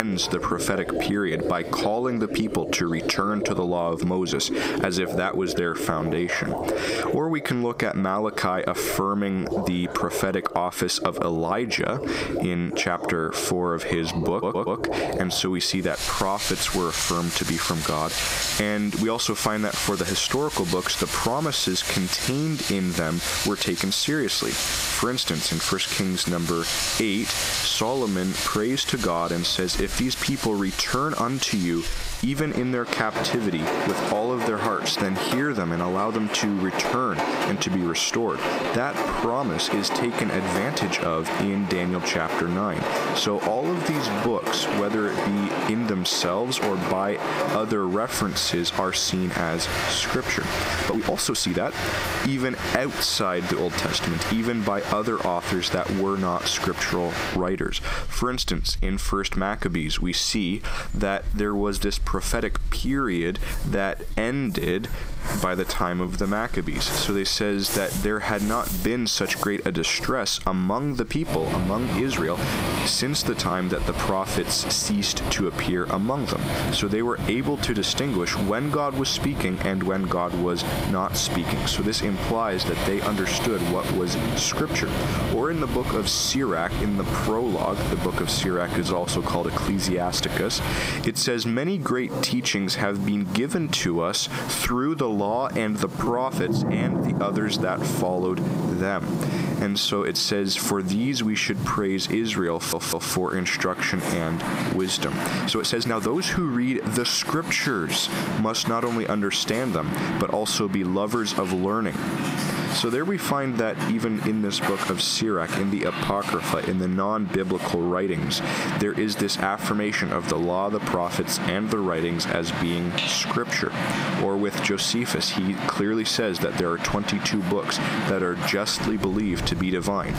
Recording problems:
squashed, flat; heavily, background pumping
rain or running water; loud; throughout; 5 dB below the speech
abrupt cut into speech; at the start
uneven, jittery; strongly; from 5.5 s to 2:08
audio stuttering; at 14 s and at 1:43

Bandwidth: 15.5 kHz